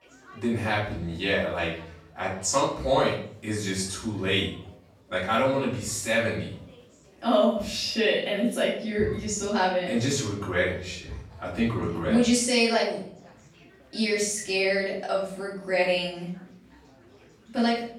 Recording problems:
off-mic speech; far
room echo; noticeable; dies away in 0.5 s
chatter from many people; faint; throughout; 25 dB below the speech

